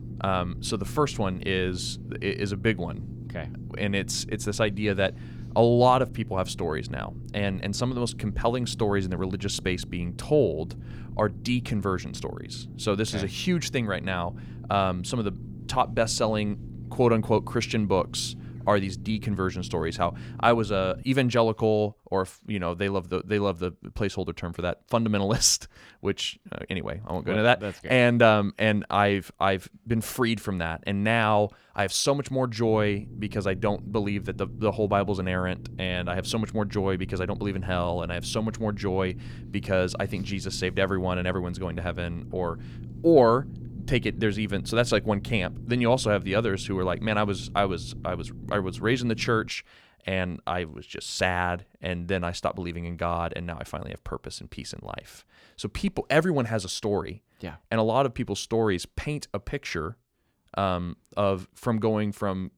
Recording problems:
low rumble; faint; until 21 s and from 33 to 49 s; 20 dB below the speech

